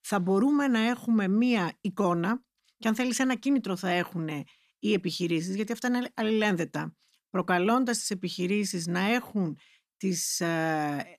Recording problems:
none

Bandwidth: 14.5 kHz